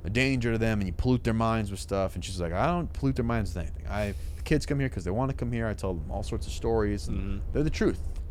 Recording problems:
low rumble; faint; throughout; 25 dB below the speech

